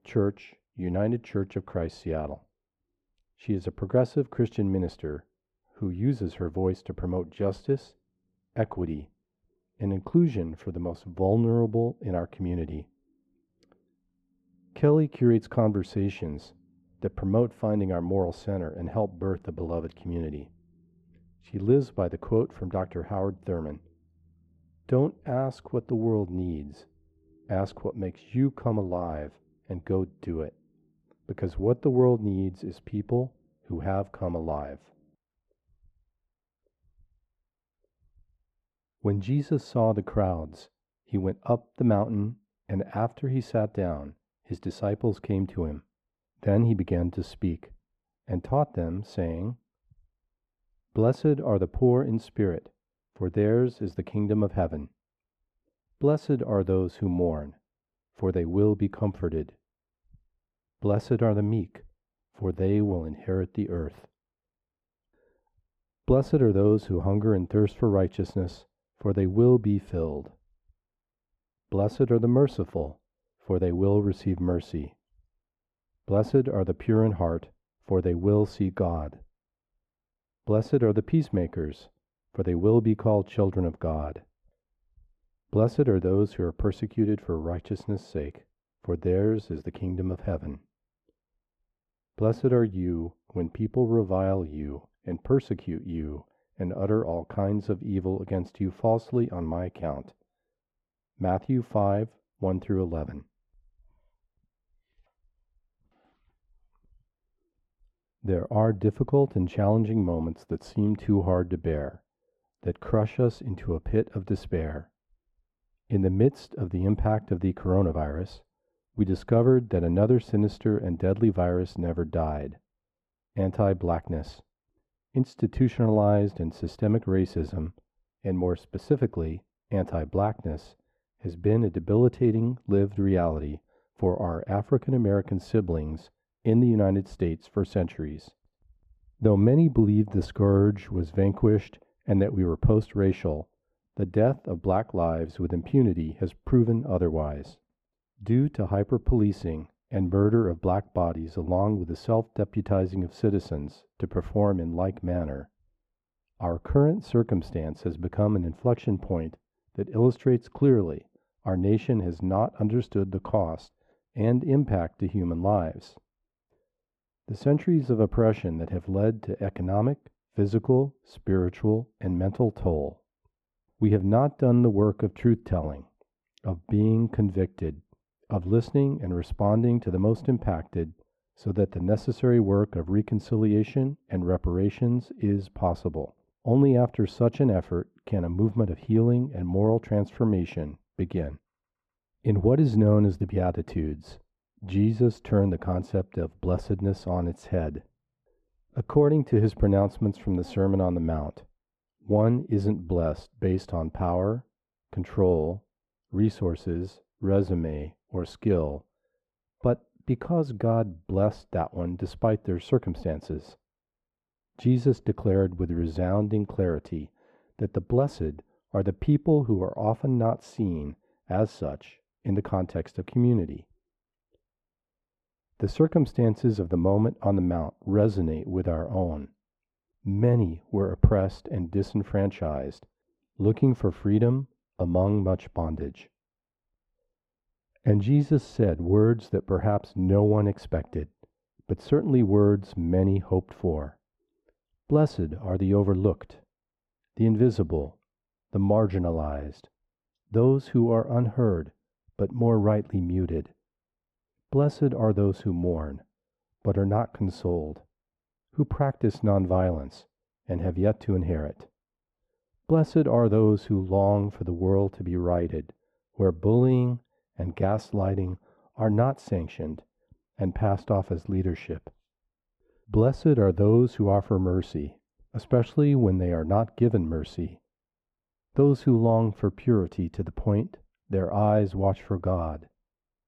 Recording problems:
muffled; very; fading above 2 kHz

